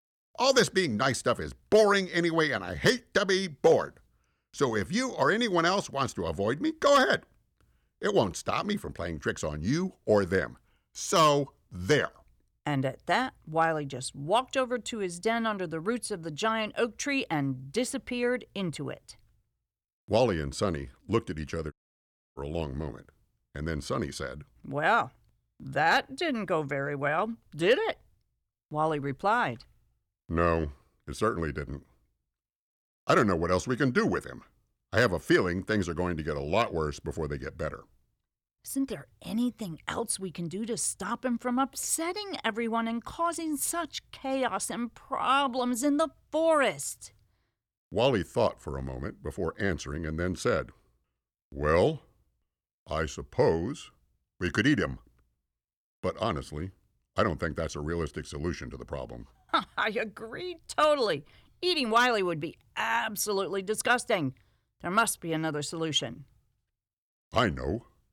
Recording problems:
audio cutting out; at 22 s for 0.5 s

